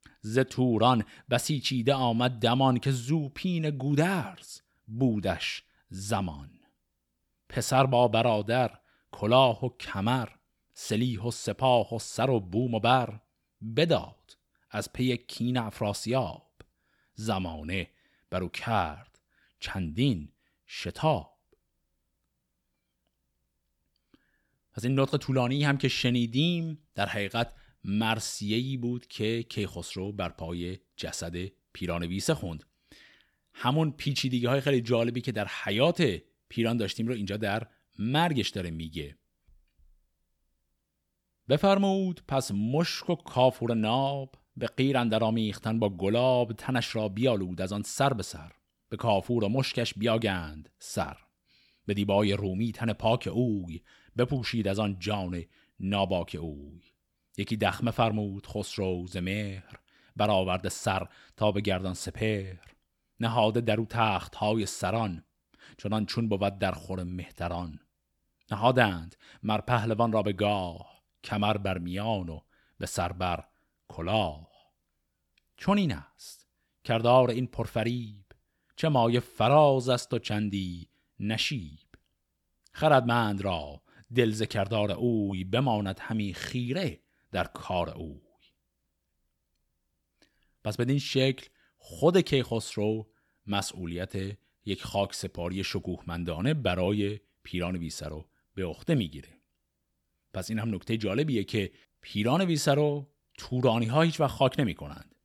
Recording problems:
none

